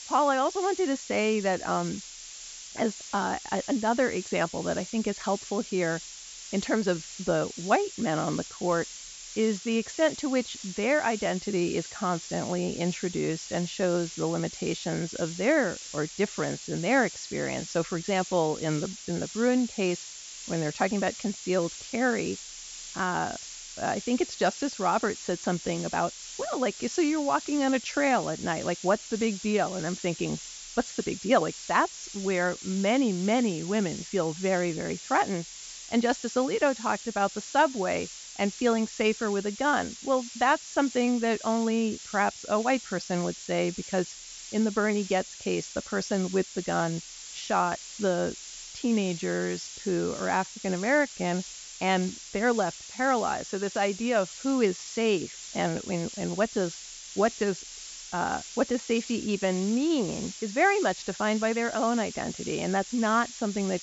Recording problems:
high frequencies cut off; noticeable; nothing above 8 kHz
hiss; noticeable; throughout; 10 dB below the speech

